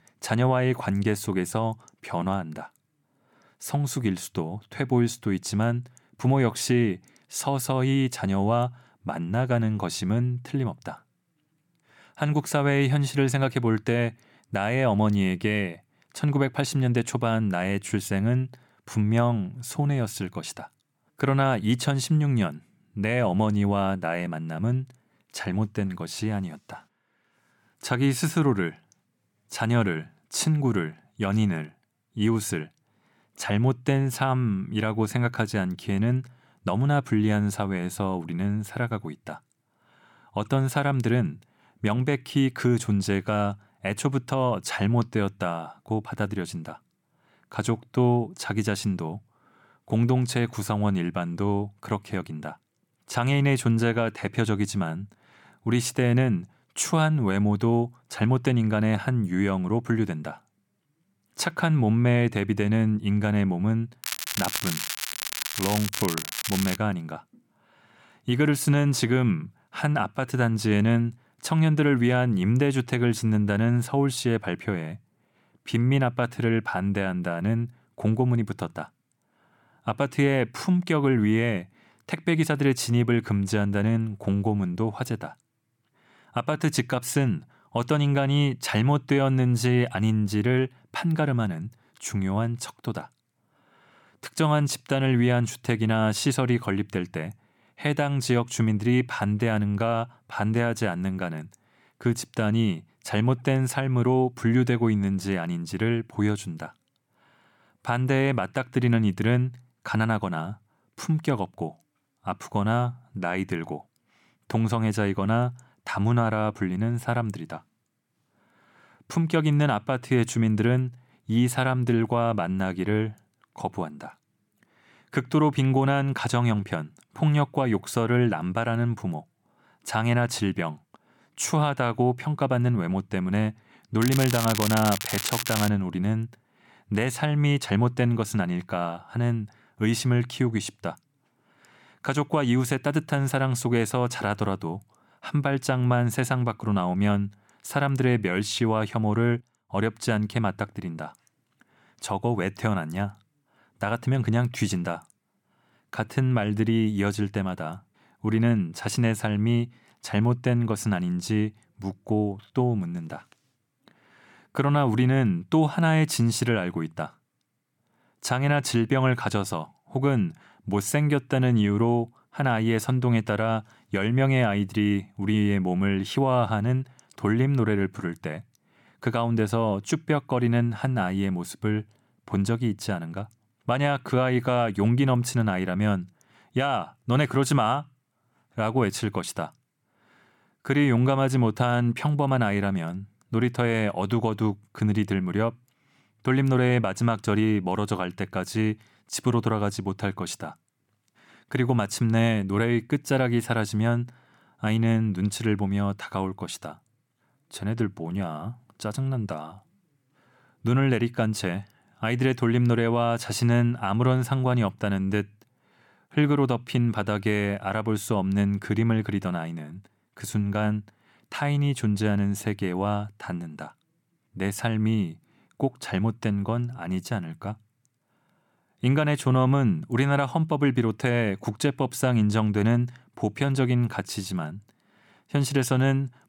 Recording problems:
crackling; loud; from 1:04 to 1:07 and from 2:14 to 2:16; 4 dB below the speech

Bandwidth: 17.5 kHz